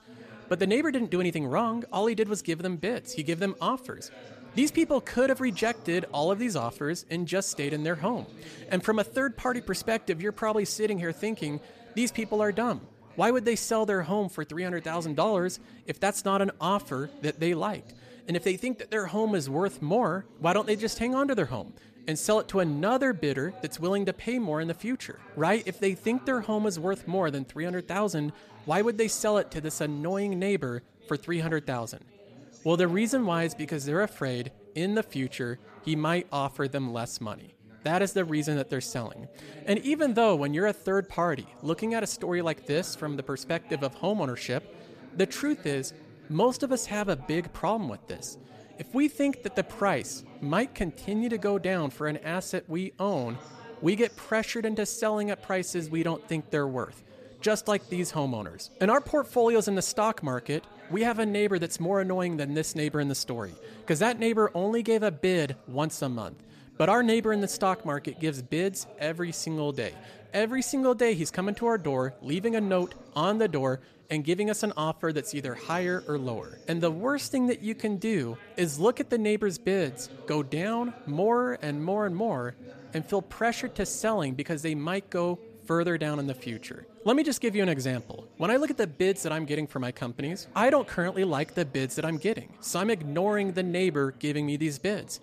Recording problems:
background chatter; faint; throughout; 3 voices, 20 dB below the speech

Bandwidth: 14.5 kHz